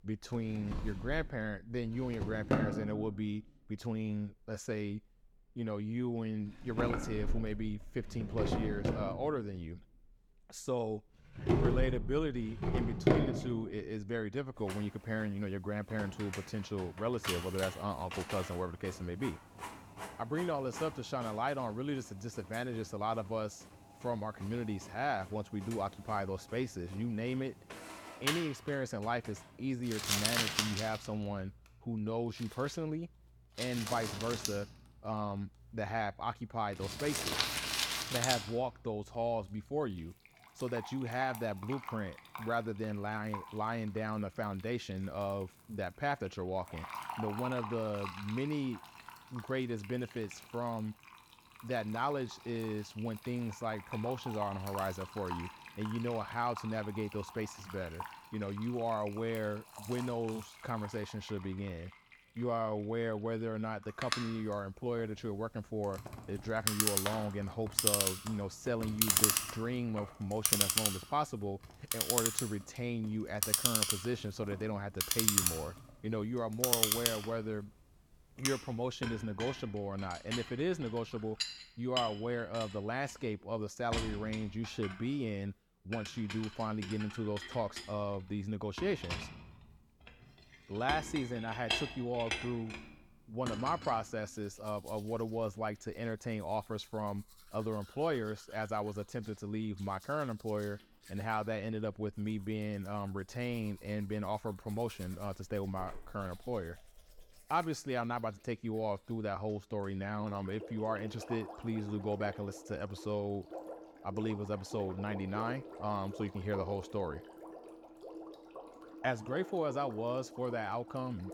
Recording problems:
household noises; very loud; throughout; 1 dB above the speech

